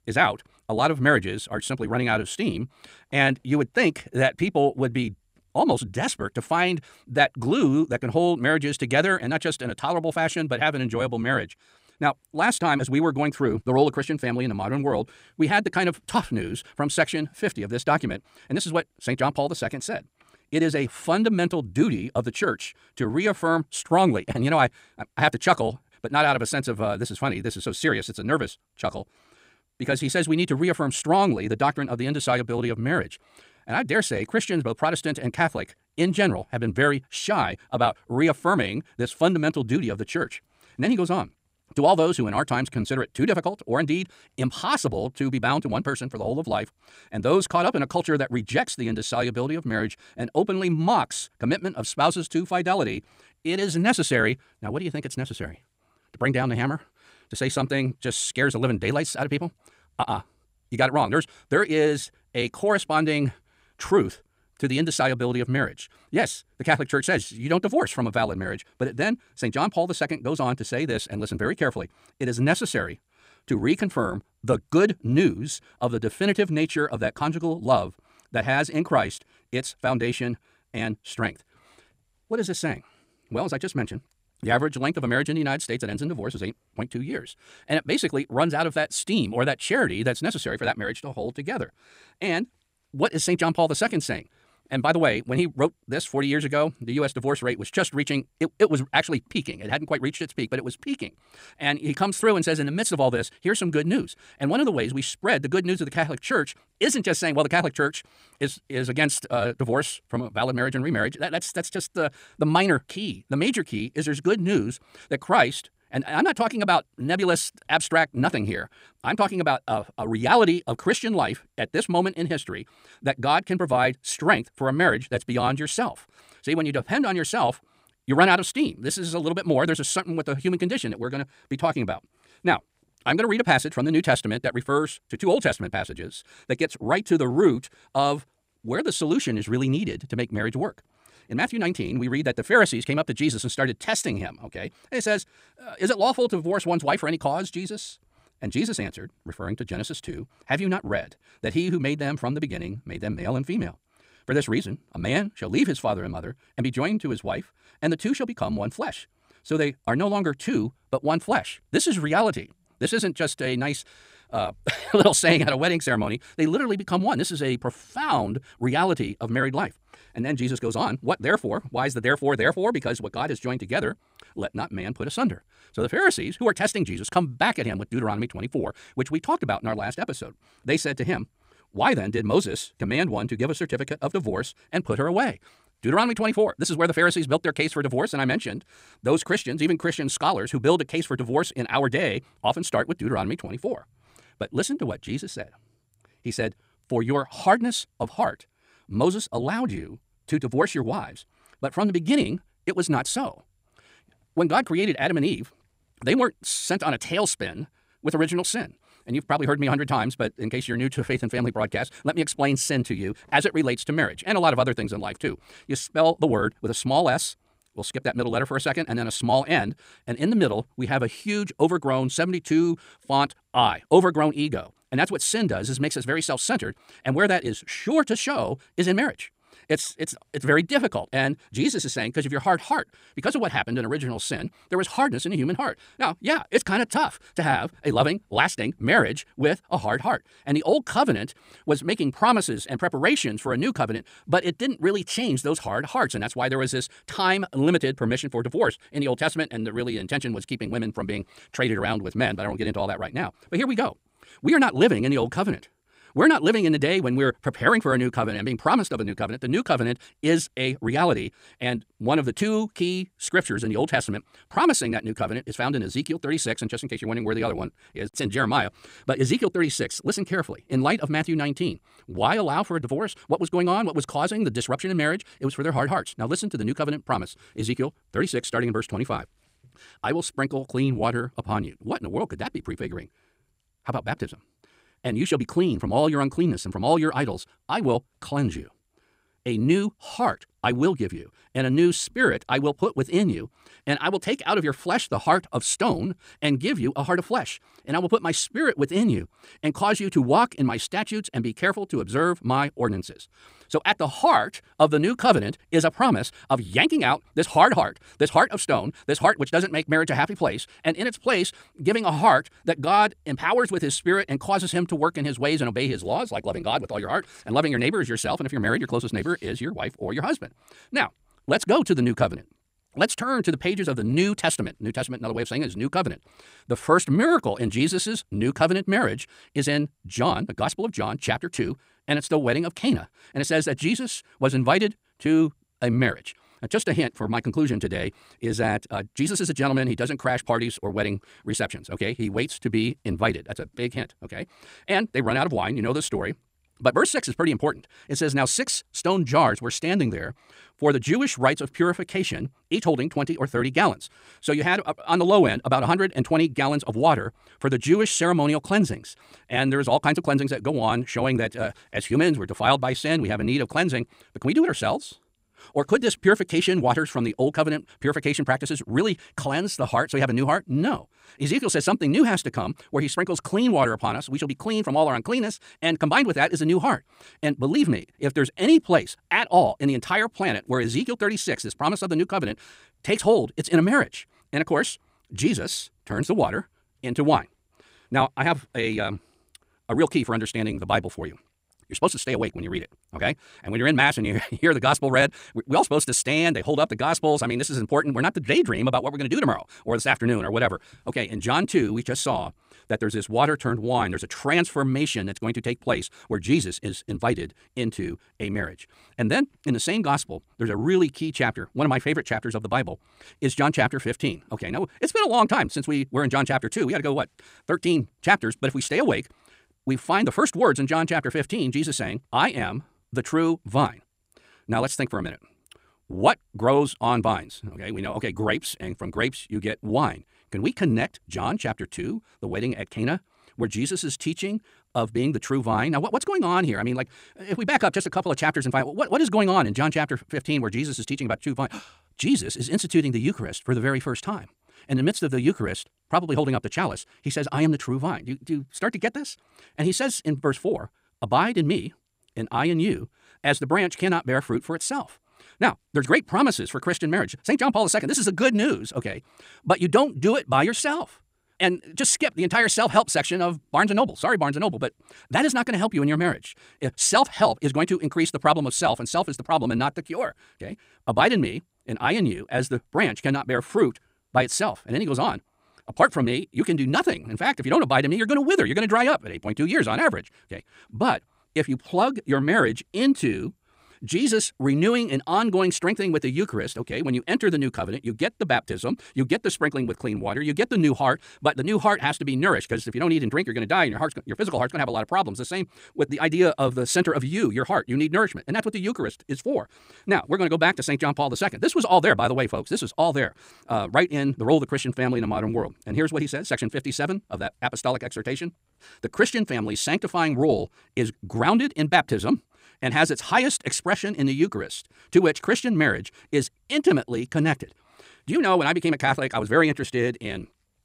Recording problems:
wrong speed, natural pitch; too fast; 1.7 times normal speed

